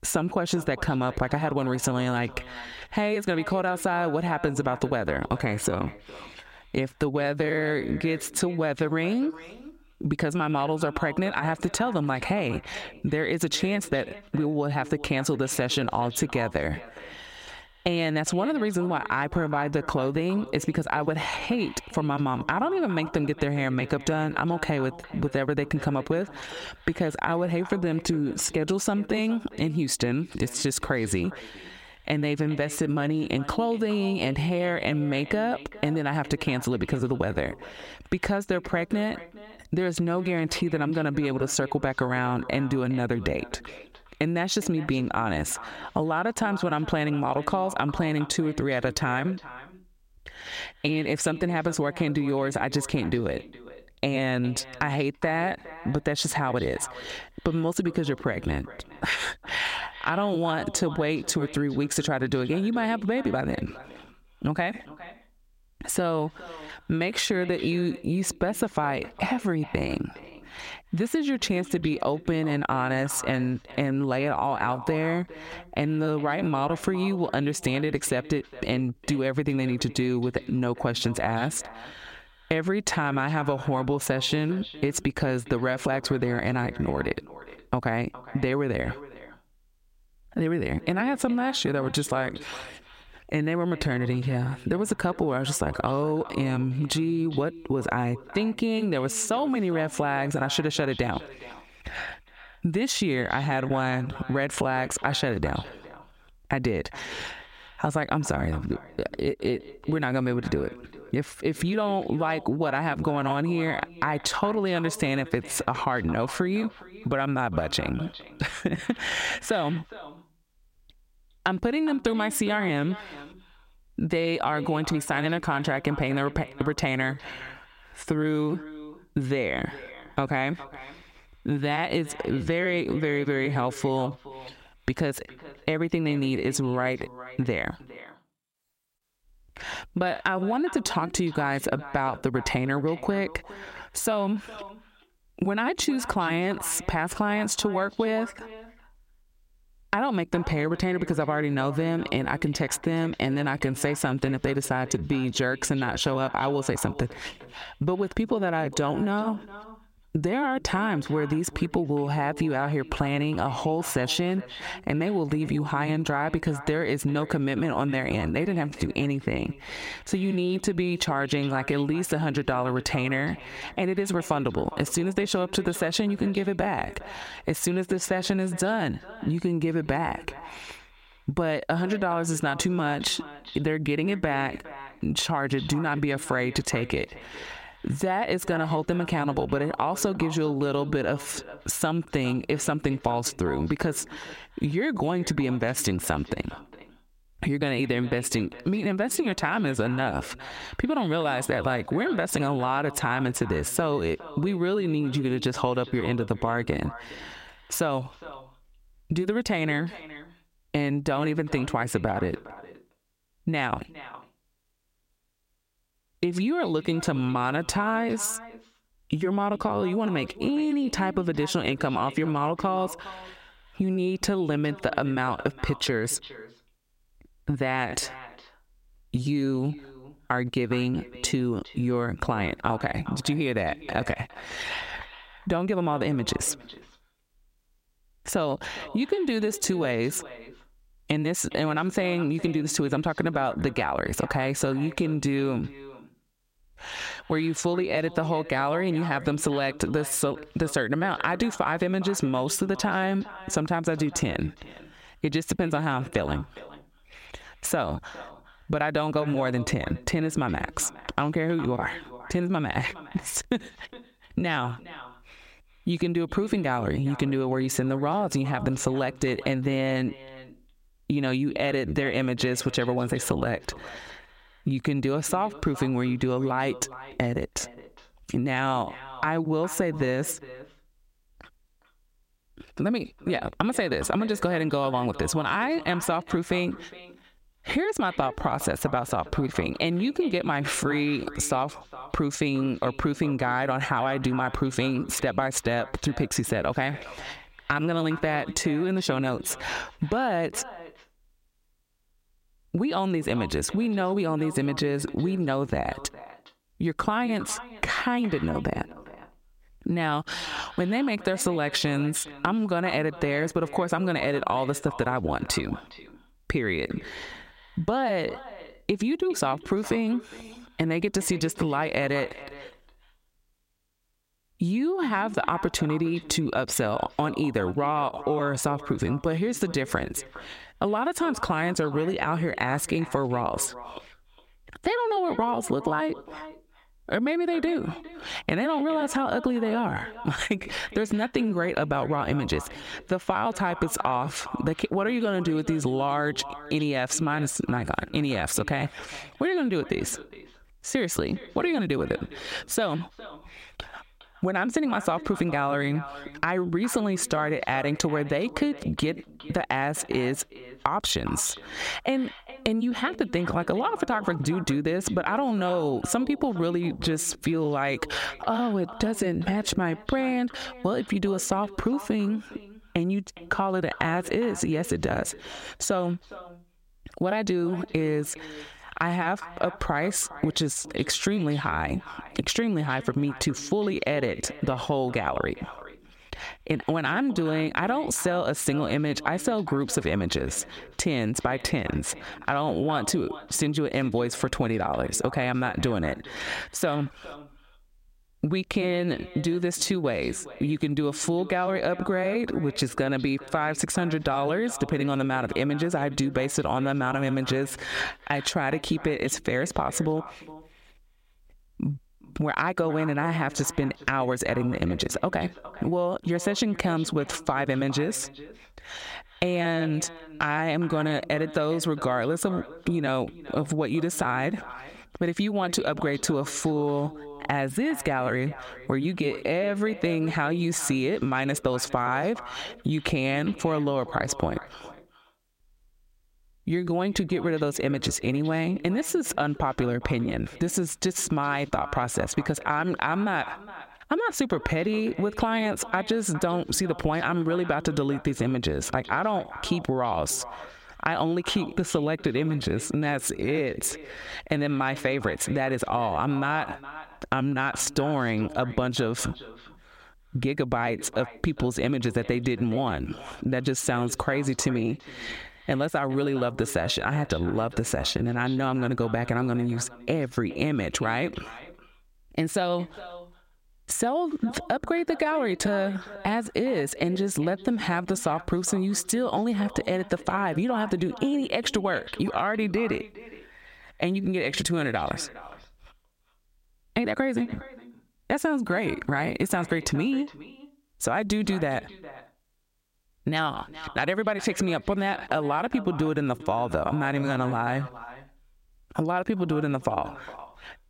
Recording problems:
echo of what is said; noticeable; throughout; 410 ms later, 15 dB below the speech
squashed, flat; somewhat

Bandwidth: 16 kHz